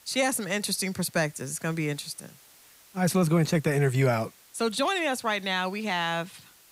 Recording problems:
hiss; faint; throughout; 25 dB below the speech

